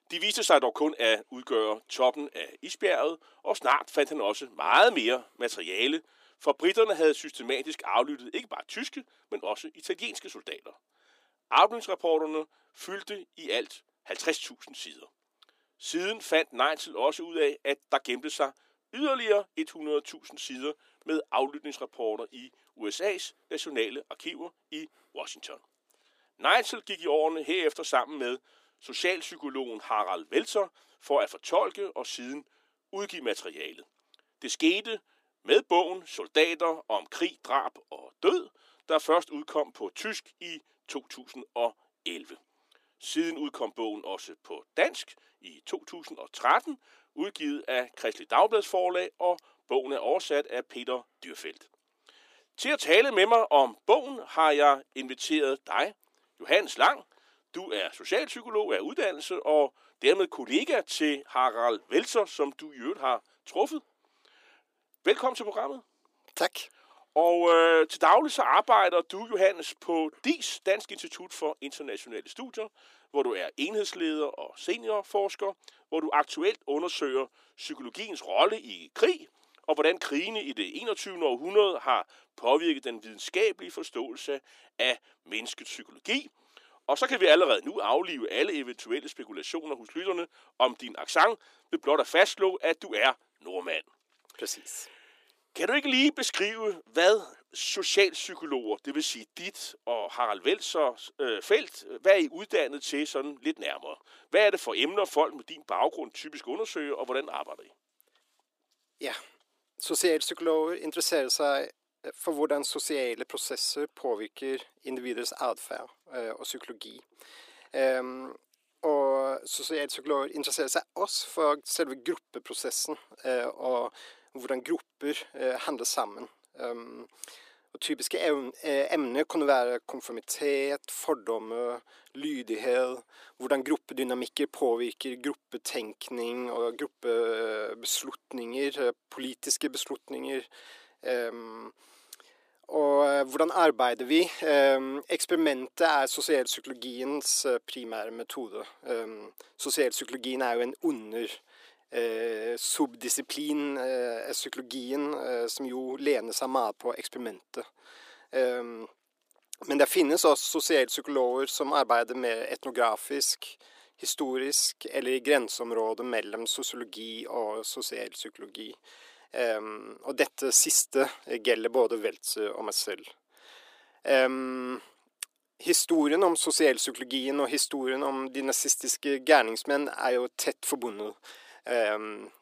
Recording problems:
thin; somewhat; fading below 300 Hz

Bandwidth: 15 kHz